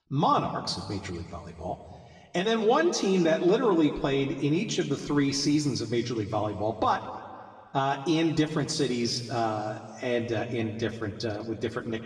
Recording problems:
room echo; slight; dies away in 1.9 s
off-mic speech; somewhat distant

